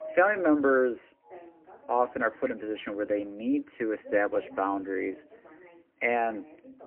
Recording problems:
phone-call audio; poor line; nothing above 3 kHz
muffled; very slightly; fading above 2.5 kHz
background music; faint; throughout; 25 dB below the speech
voice in the background; faint; throughout; 25 dB below the speech

